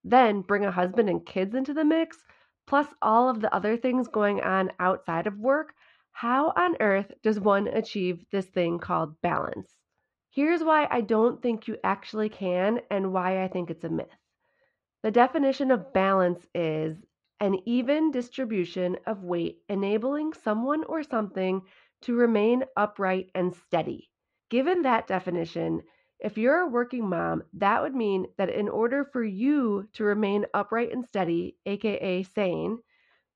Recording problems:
muffled; slightly; fading above 3 kHz

